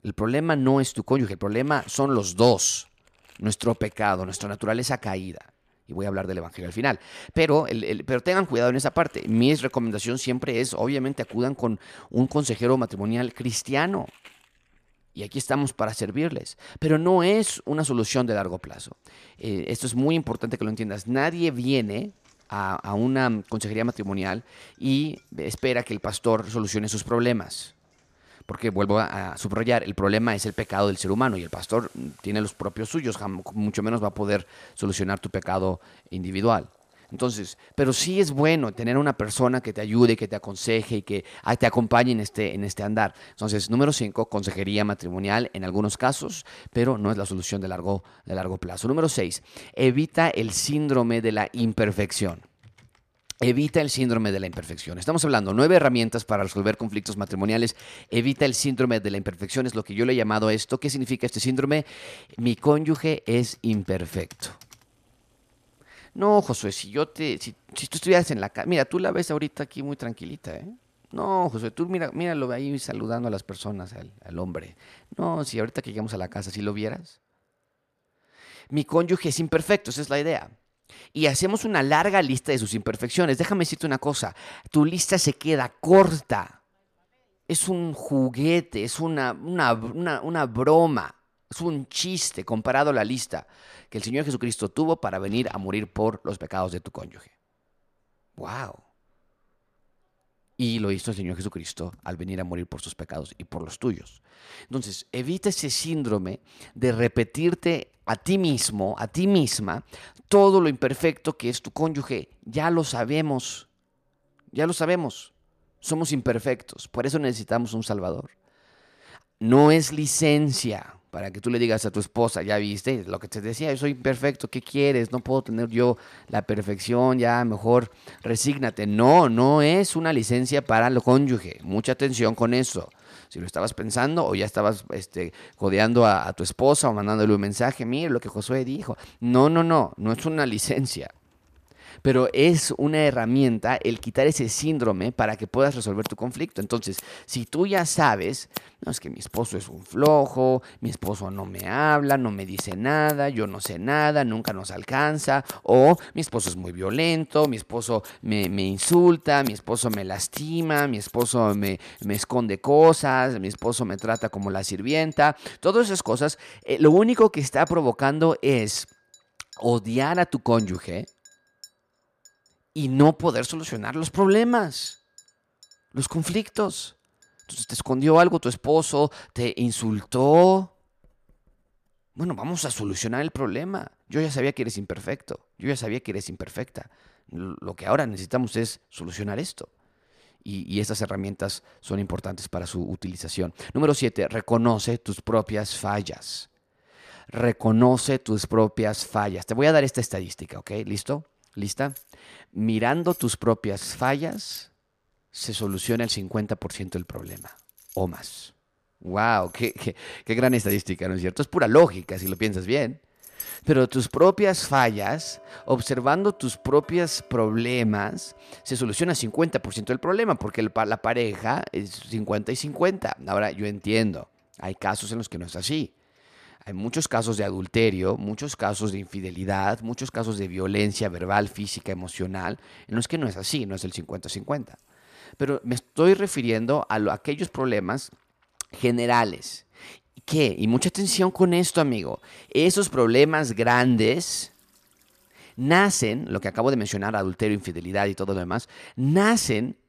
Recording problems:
household noises; faint; throughout; 20 dB below the speech

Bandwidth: 14.5 kHz